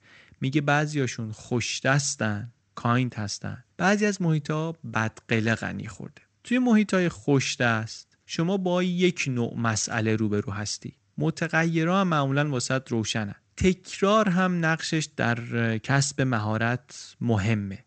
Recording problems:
garbled, watery; slightly; nothing above 8 kHz

